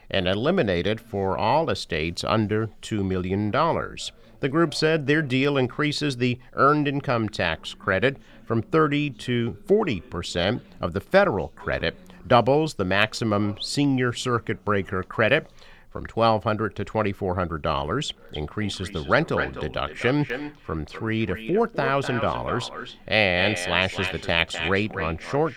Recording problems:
echo of what is said; strong; from 18 s on; 250 ms later, 9 dB below the speech
voice in the background; faint; throughout; 30 dB below the speech

